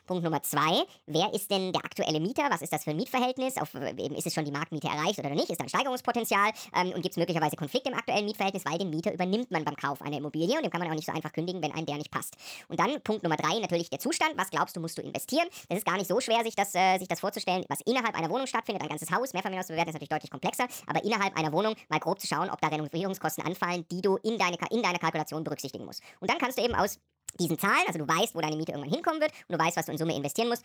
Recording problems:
wrong speed and pitch; too fast and too high; 1.5 times normal speed

